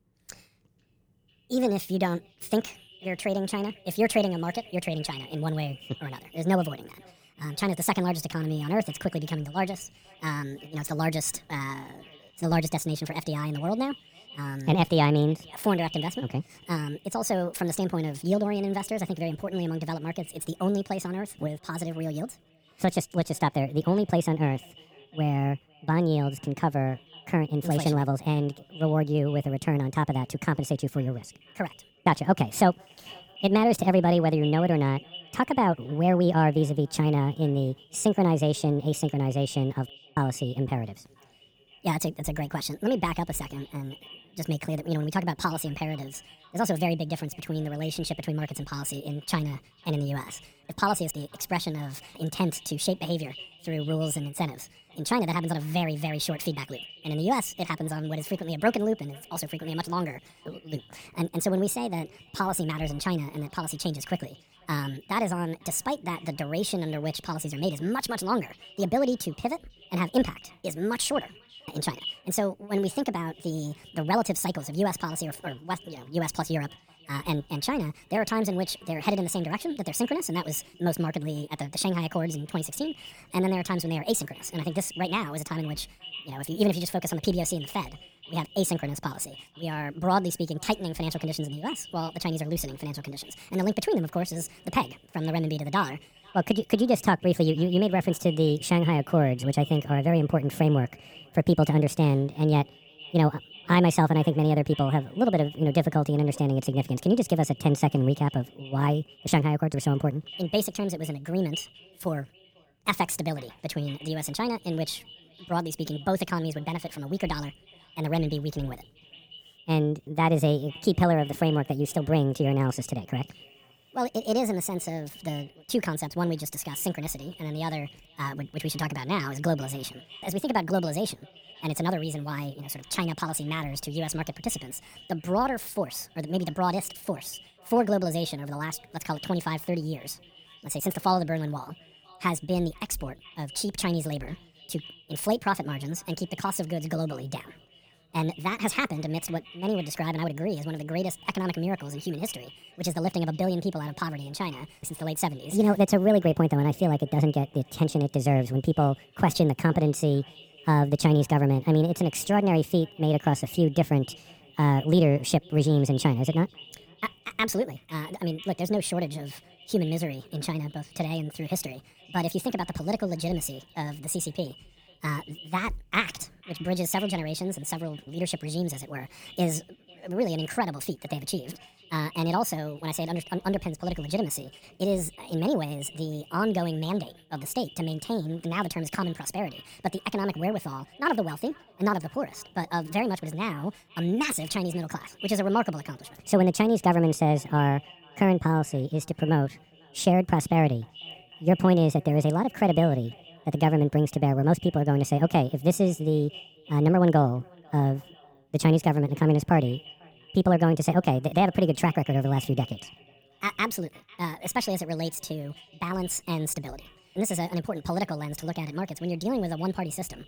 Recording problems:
wrong speed and pitch; too fast and too high; 1.5 times normal speed
echo of what is said; faint; throughout; 500 ms later, 20 dB below the speech

